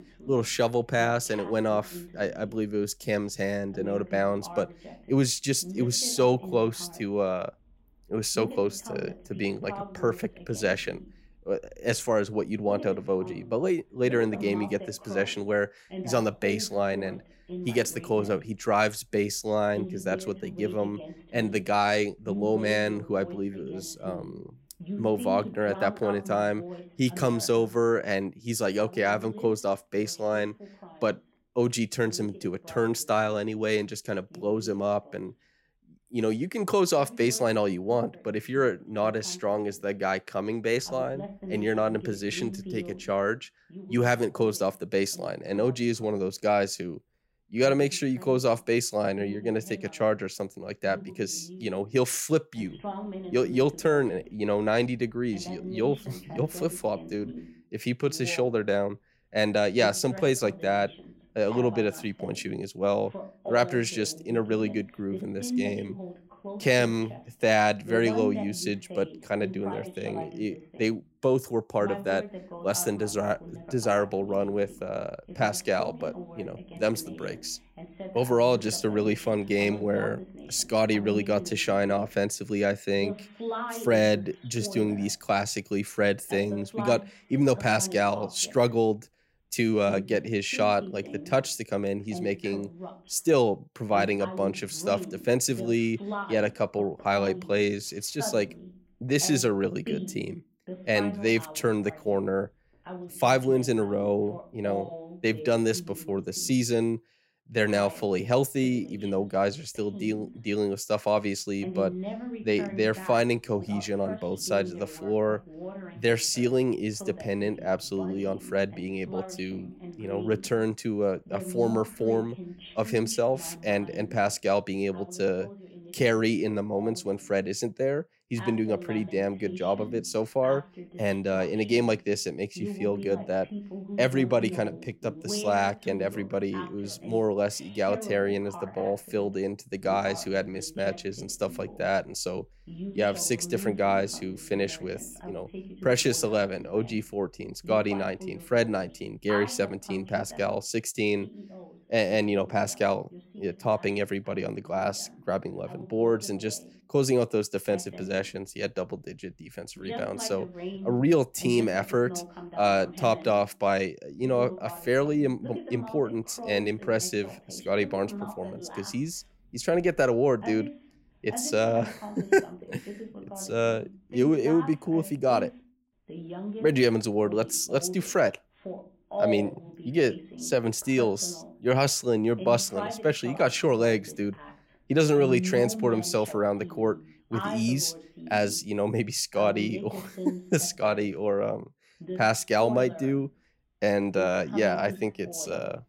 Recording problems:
voice in the background; noticeable; throughout; 15 dB below the speech

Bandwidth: 16 kHz